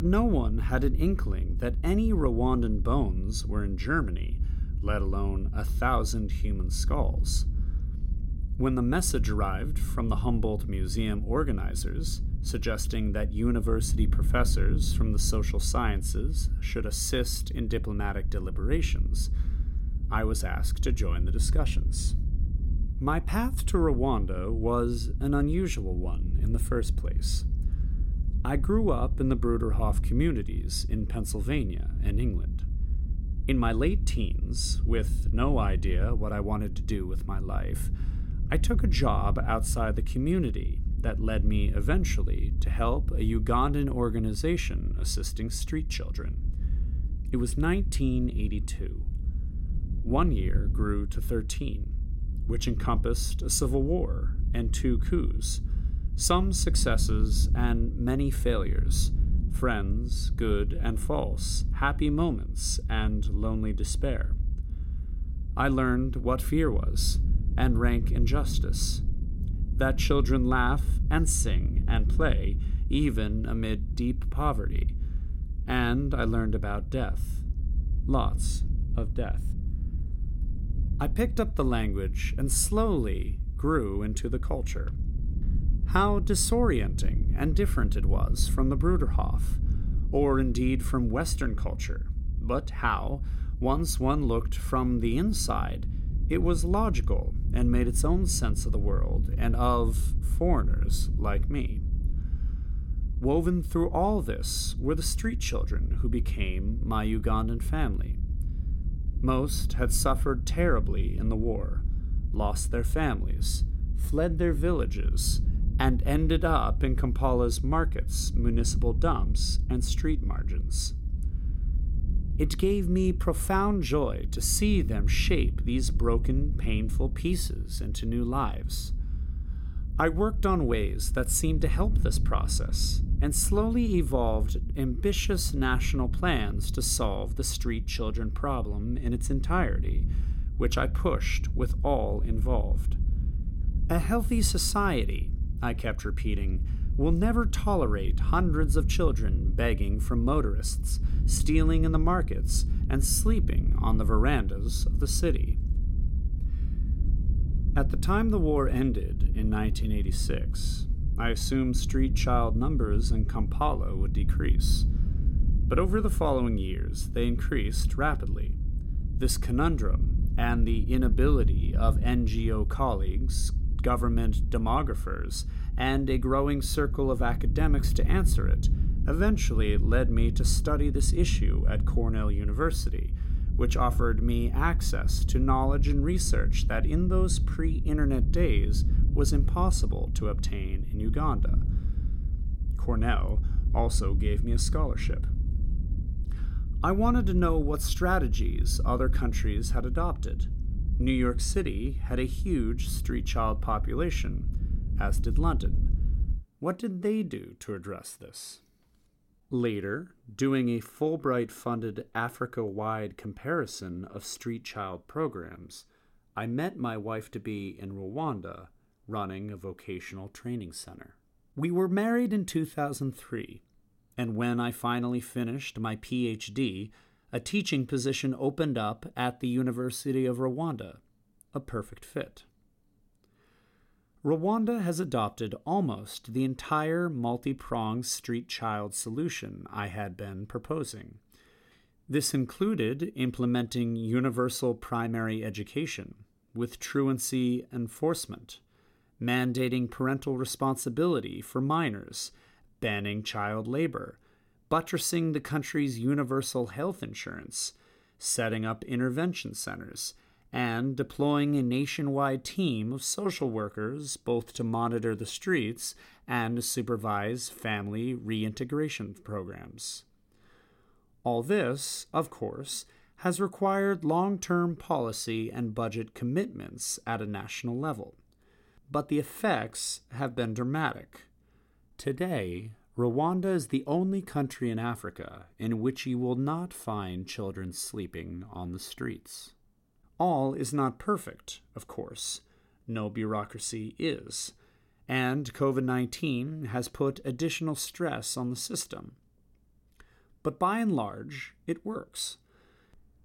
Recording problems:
low rumble; noticeable; until 3:26; 15 dB below the speech
abrupt cut into speech; at the start

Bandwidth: 16.5 kHz